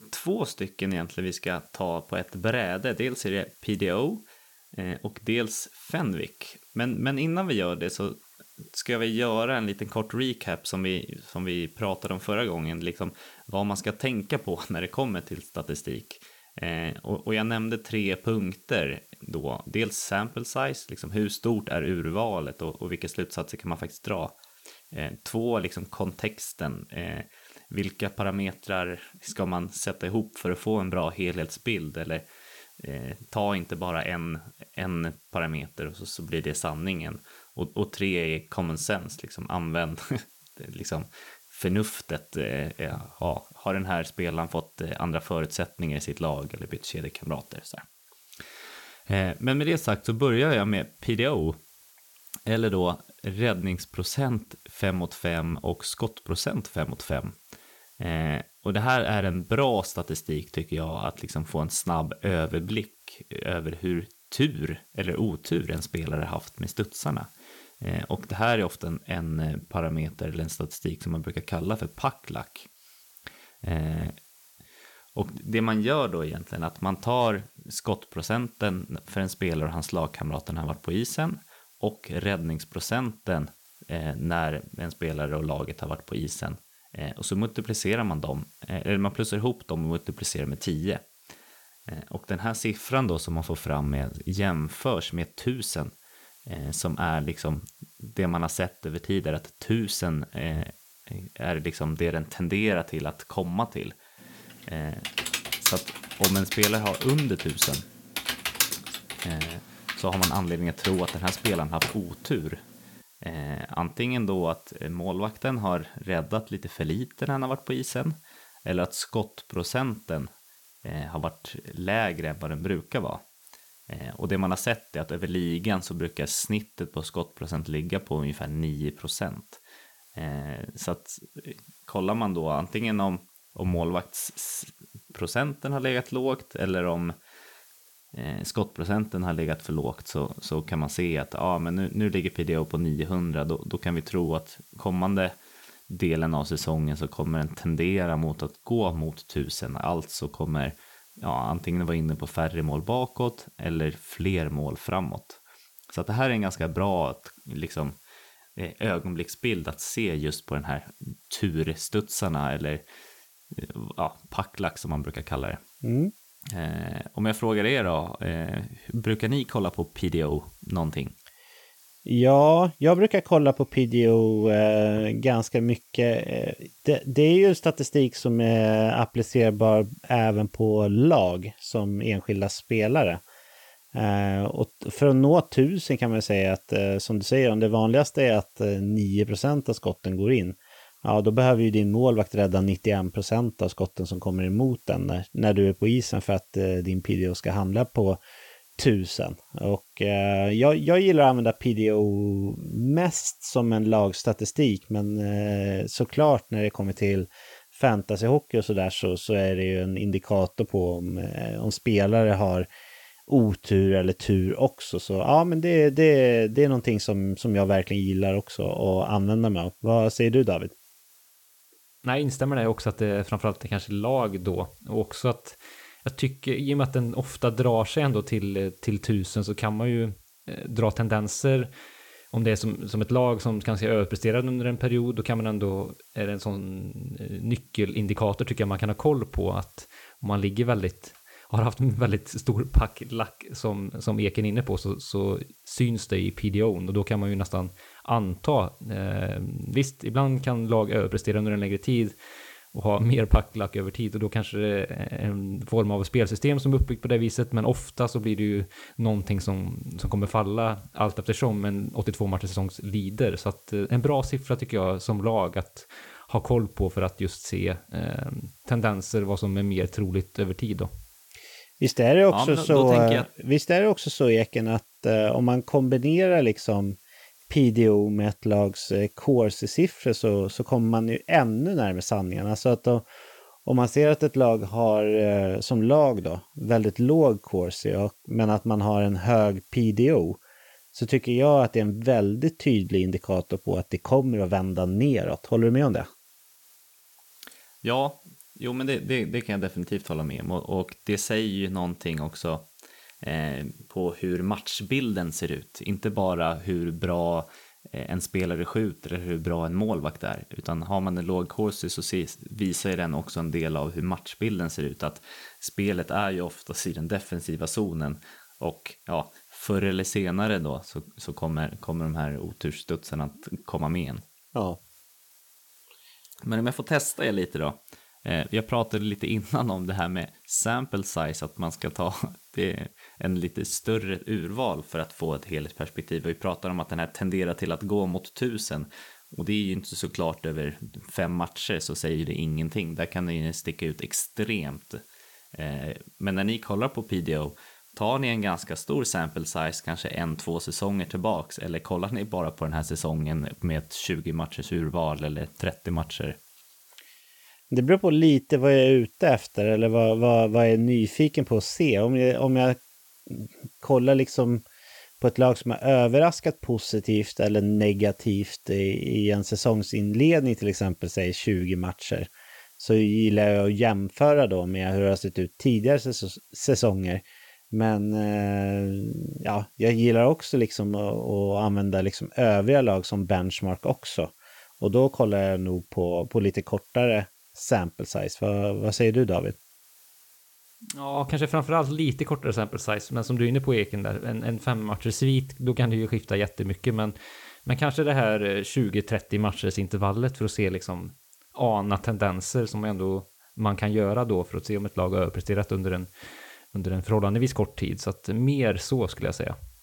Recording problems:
hiss; faint; throughout; 25 dB below the speech
keyboard typing; loud; from 1:45 to 1:52; peak 3 dB above the speech

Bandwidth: 17 kHz